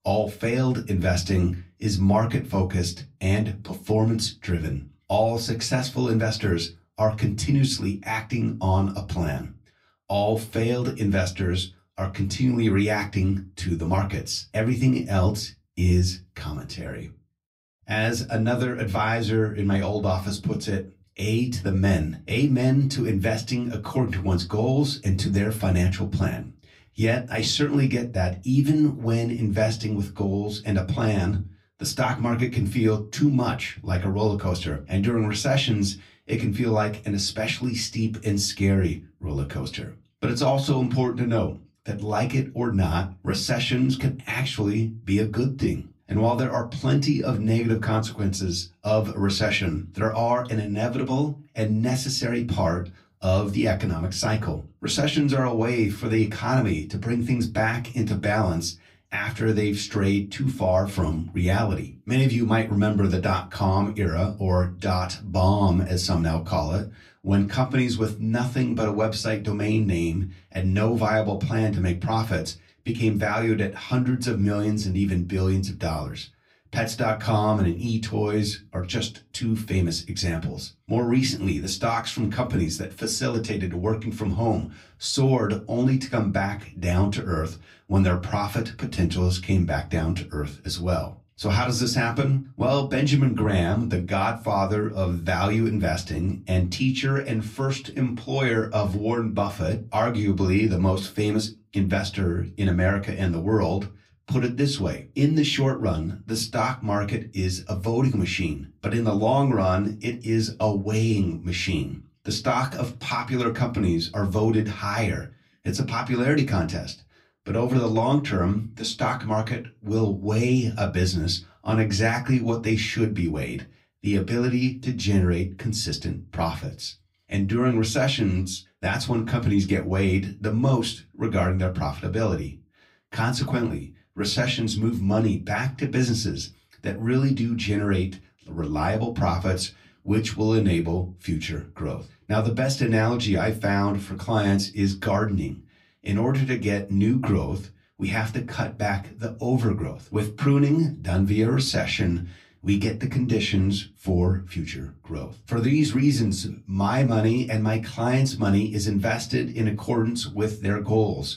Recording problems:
off-mic speech; far
room echo; very slight; dies away in 0.2 s

